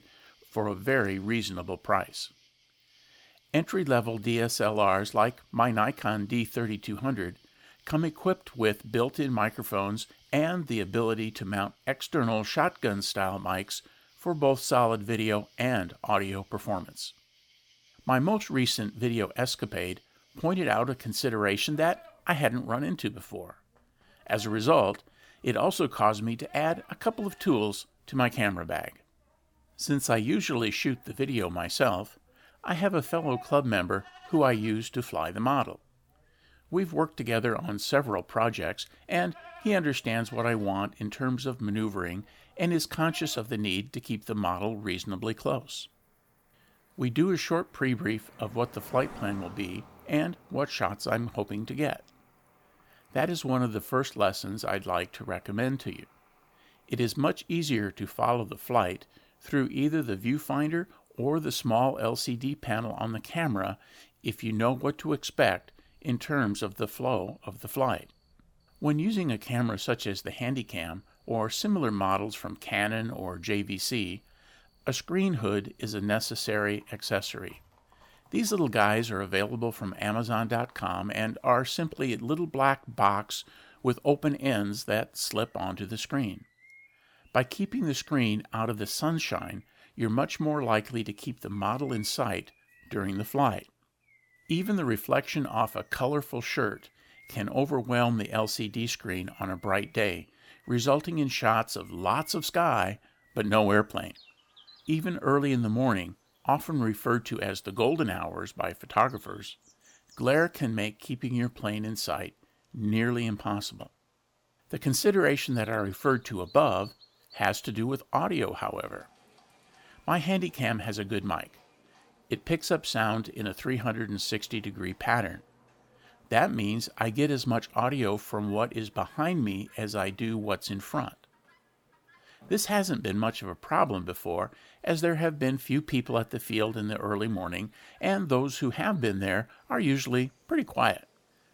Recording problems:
animal sounds; faint; throughout; 30 dB below the speech

